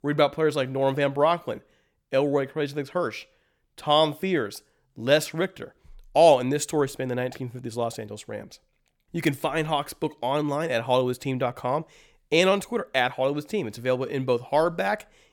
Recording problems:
none

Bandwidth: 18.5 kHz